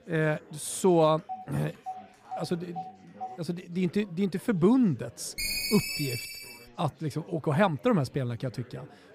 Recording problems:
chatter from many people; faint; throughout; 25 dB below the speech
phone ringing; faint; from 1.5 to 3.5 s; peak 15 dB below the speech
phone ringing; noticeable; from 5.5 to 6.5 s; peak level with the speech

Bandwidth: 15 kHz